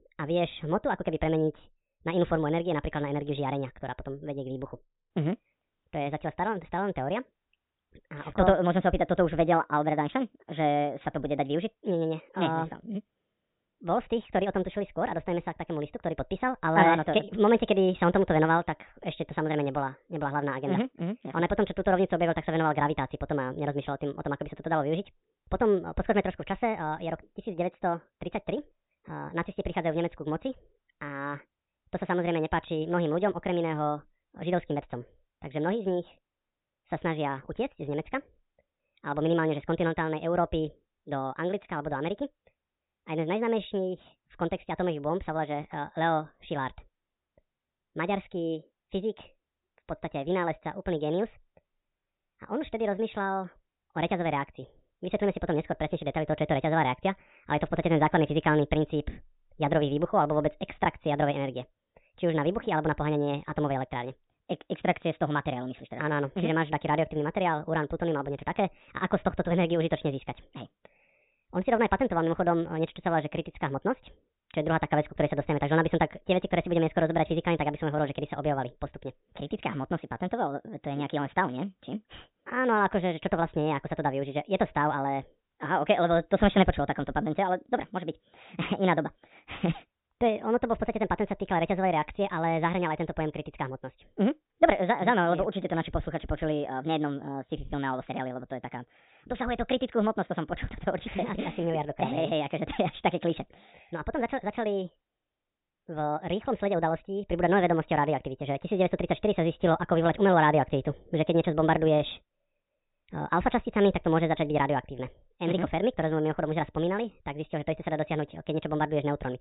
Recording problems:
high frequencies cut off; severe; nothing above 4 kHz
wrong speed and pitch; too fast and too high; 1.5 times normal speed

